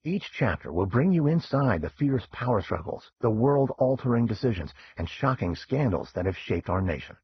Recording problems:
garbled, watery; badly; nothing above 6 kHz
muffled; very slightly; fading above 3.5 kHz

